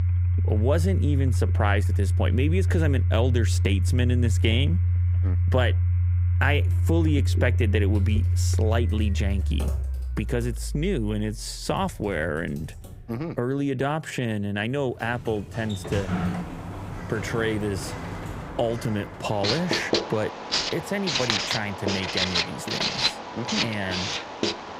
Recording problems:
household noises; very loud; throughout; 4 dB above the speech
keyboard typing; noticeable; from 8 to 13 s; peak 8 dB below the speech
door banging; loud; from 15 to 20 s; peak 1 dB above the speech

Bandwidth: 15.5 kHz